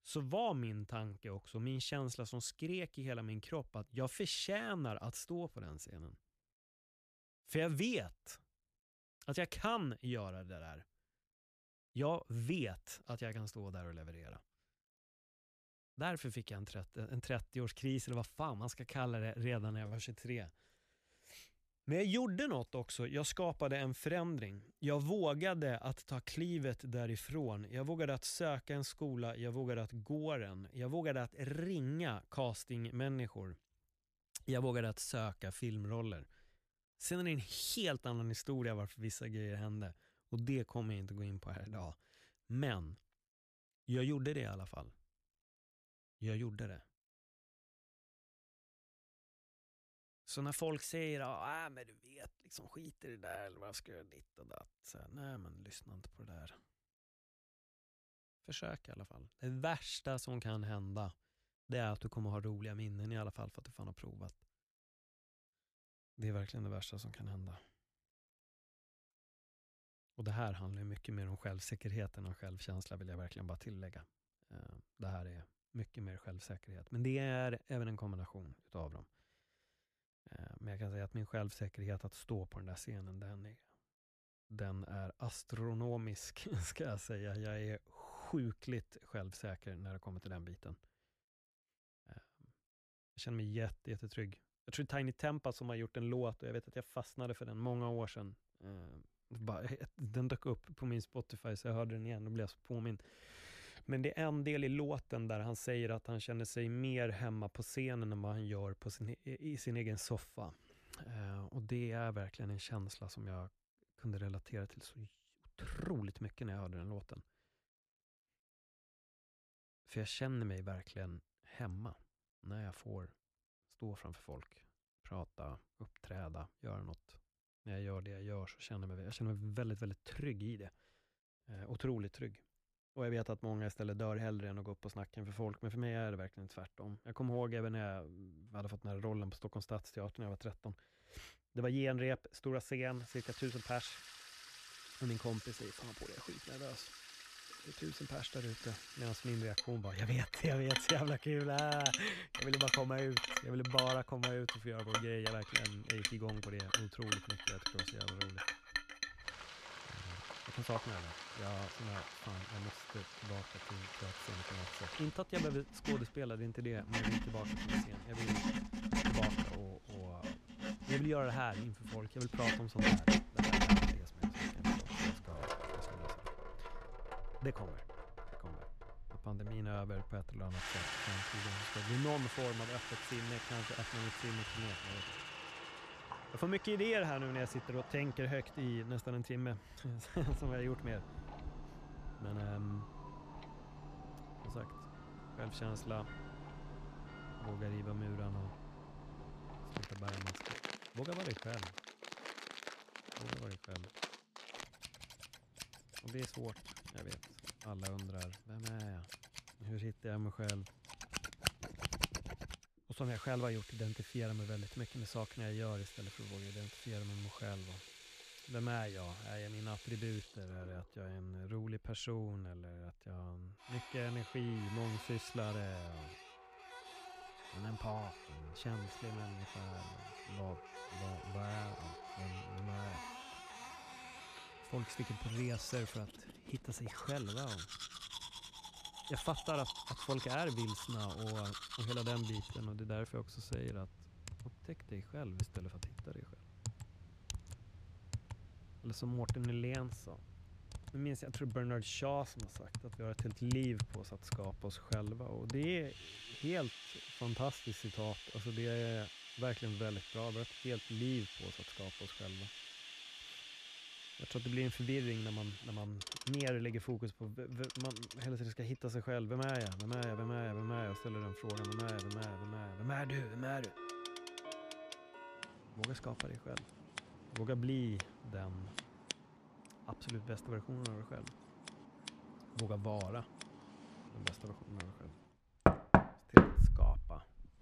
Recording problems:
household noises; very loud; from 2:23 on; 1 dB above the speech

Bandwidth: 14.5 kHz